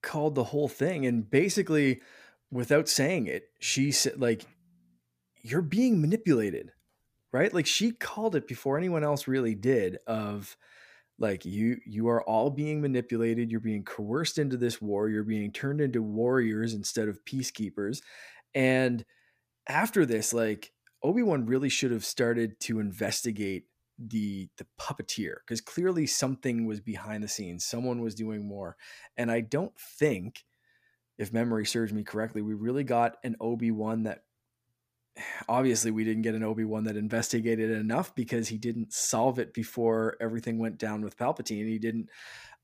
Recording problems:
none

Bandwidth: 15 kHz